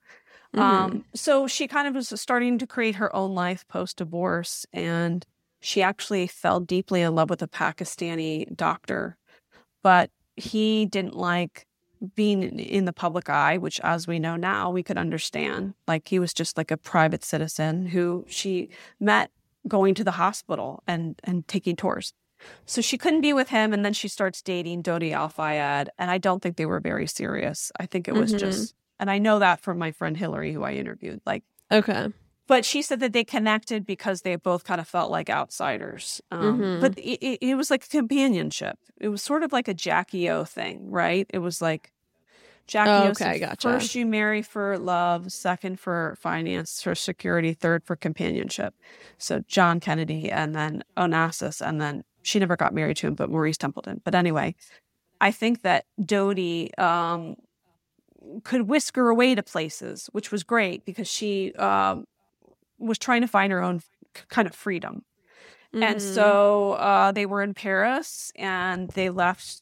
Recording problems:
none

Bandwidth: 16.5 kHz